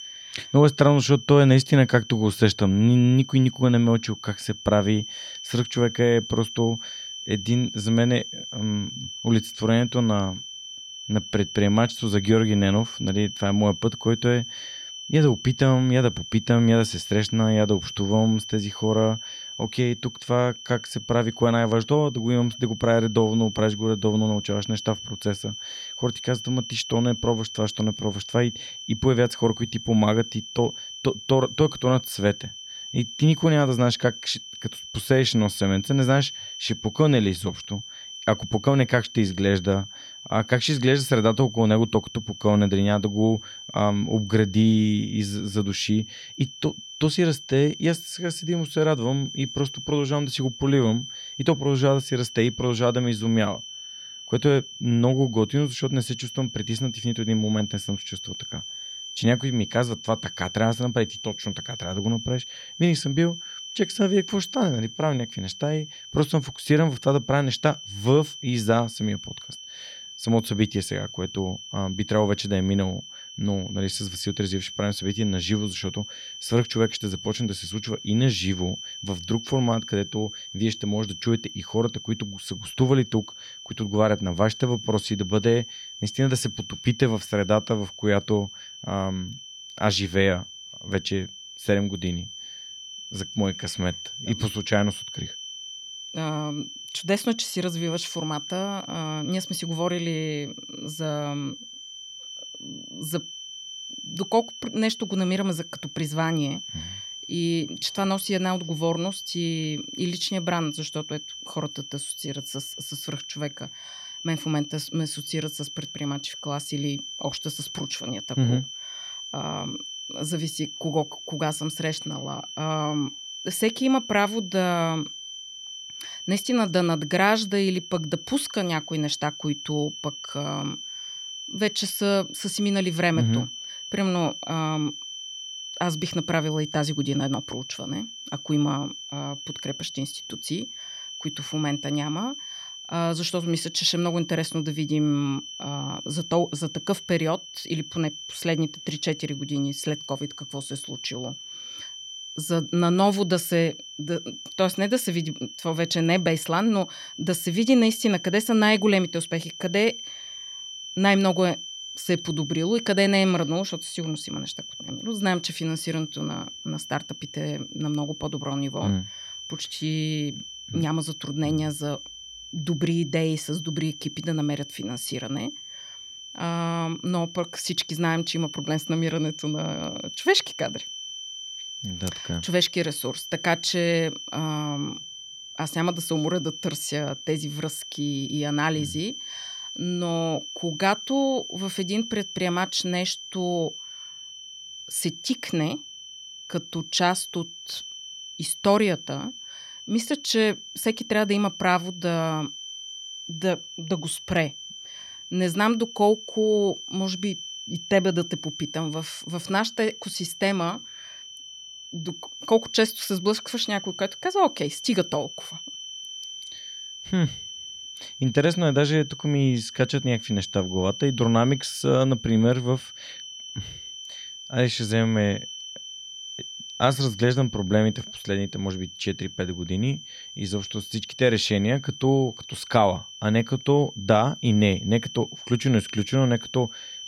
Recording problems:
high-pitched whine; noticeable; throughout; 3 kHz, 10 dB below the speech

